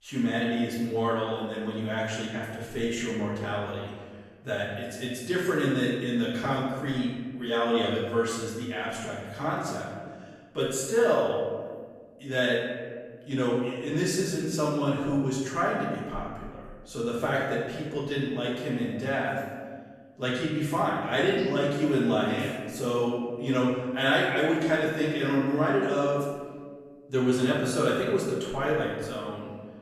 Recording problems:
off-mic speech; far
room echo; noticeable; dies away in 1.5 s

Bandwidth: 14 kHz